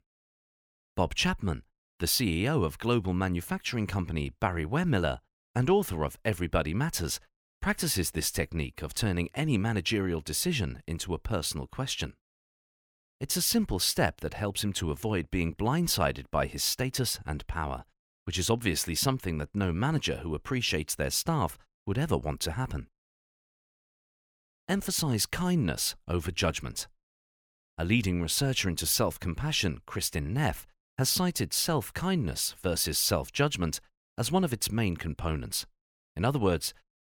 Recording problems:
none

